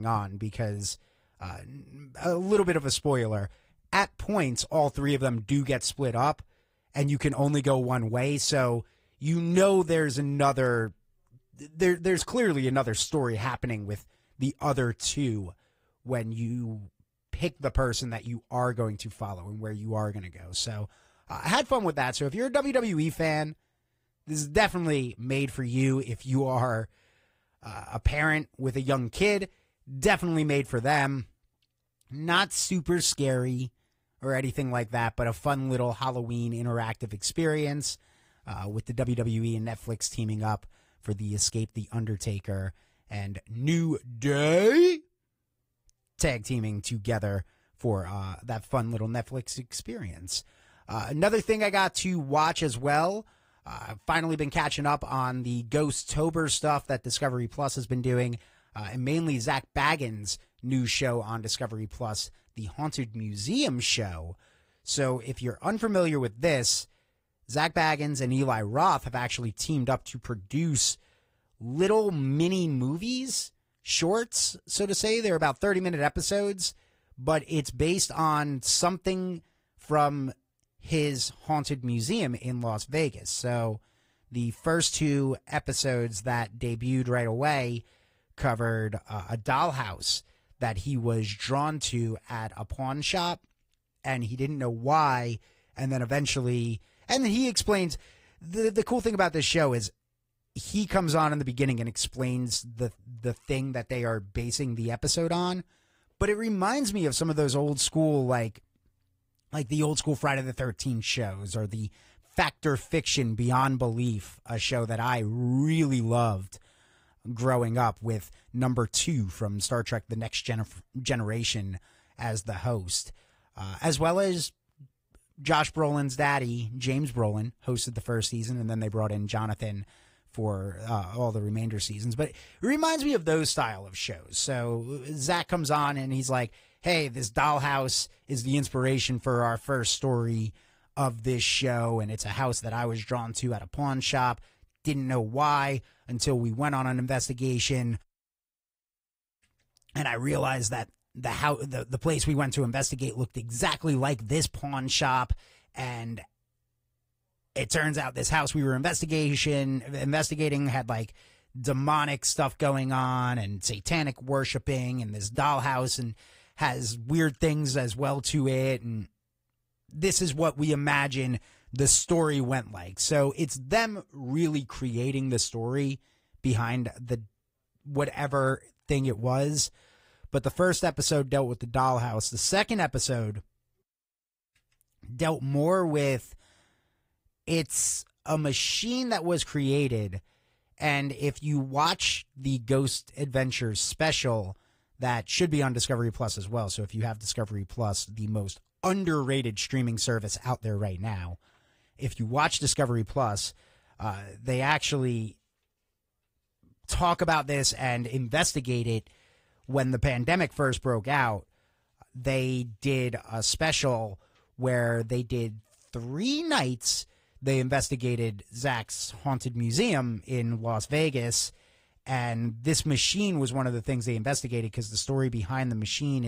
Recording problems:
garbled, watery; slightly; nothing above 15.5 kHz
abrupt cut into speech; at the start and the end

